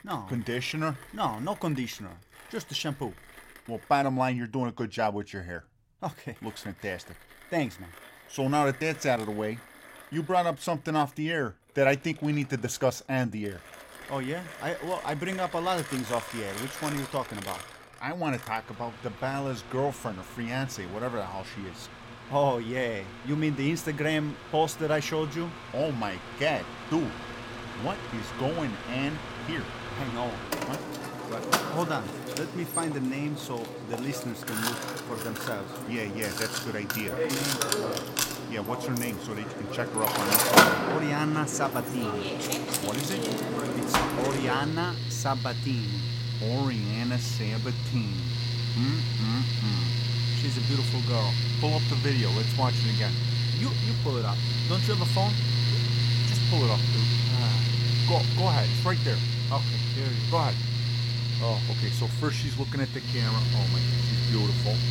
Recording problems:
machinery noise; very loud; throughout; 4 dB above the speech

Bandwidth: 16.5 kHz